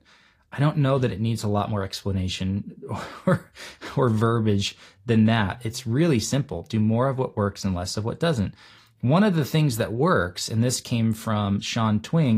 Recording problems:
garbled, watery; slightly; nothing above 15.5 kHz
abrupt cut into speech; at the end

